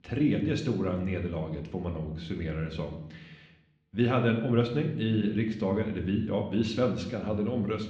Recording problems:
muffled; slightly; fading above 4 kHz
room echo; slight; dies away in 0.7 s
off-mic speech; somewhat distant

